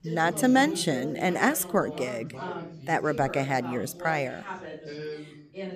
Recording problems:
background chatter; noticeable; throughout; 4 voices, 10 dB below the speech

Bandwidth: 14.5 kHz